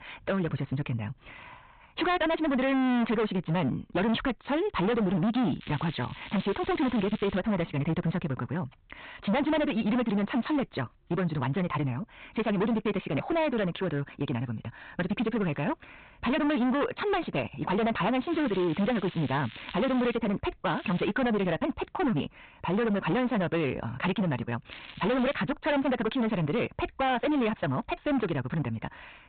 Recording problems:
distortion; heavy; 20% of the sound clipped
high frequencies cut off; severe; nothing above 4 kHz
wrong speed, natural pitch; too fast; 1.6 times normal speed
crackling; noticeable; 4 times, first at 5.5 s; 15 dB below the speech

